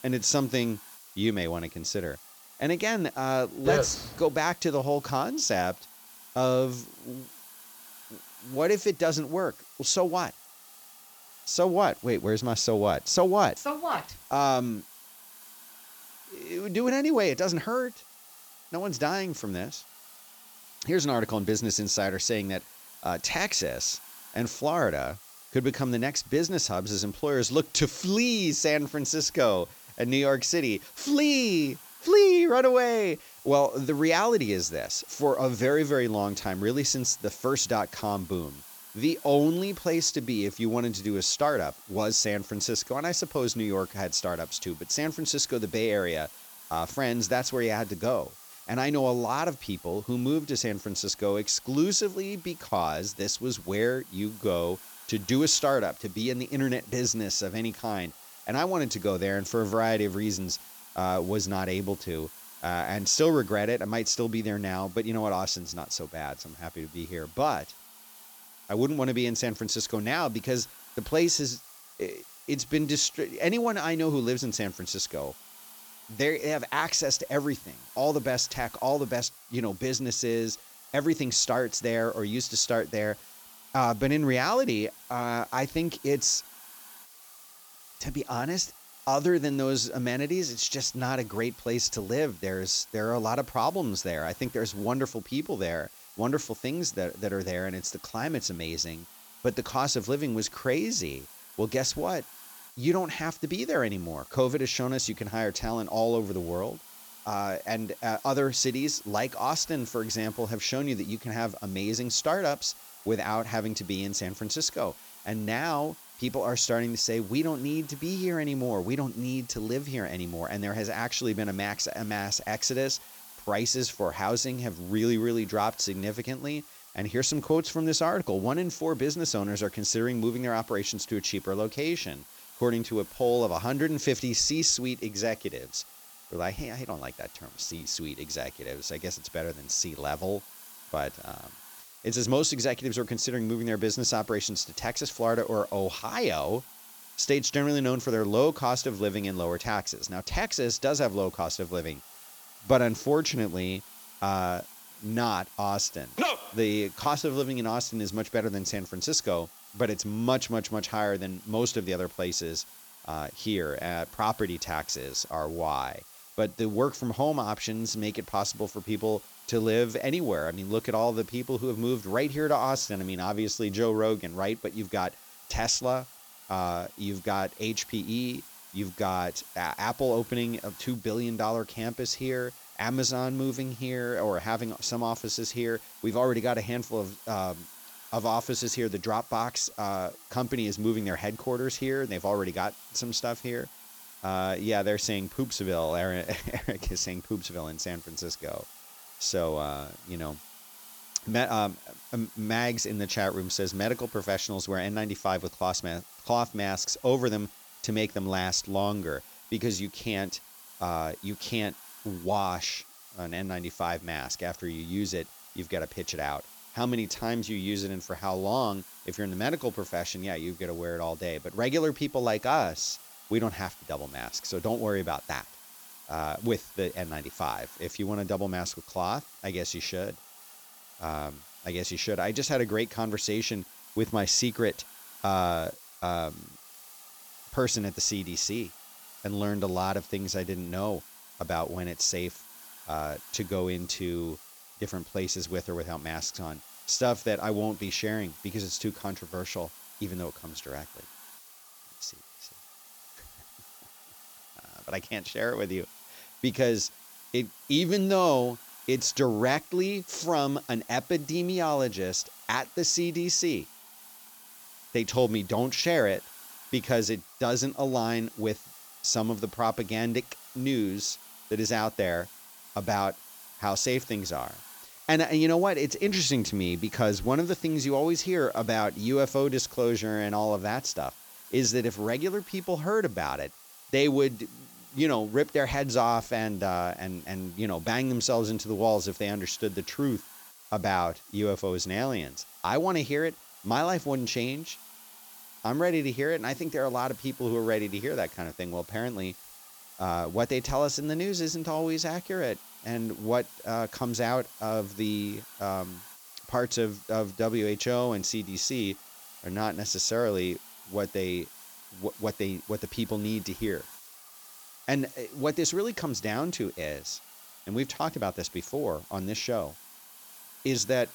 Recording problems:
high frequencies cut off; noticeable; nothing above 8 kHz
hiss; noticeable; throughout; 20 dB below the speech

